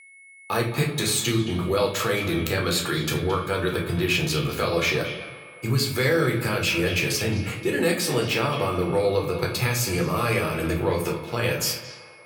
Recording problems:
echo of what is said; noticeable; throughout; 220 ms later, 15 dB below the speech
room echo; slight; dies away in 0.5 s
off-mic speech; somewhat distant
high-pitched whine; faint; throughout; 2 kHz, 20 dB below the speech

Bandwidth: 17.5 kHz